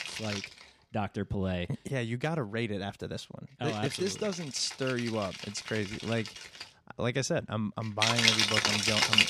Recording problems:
background music; very loud; throughout; 4 dB above the speech

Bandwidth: 15 kHz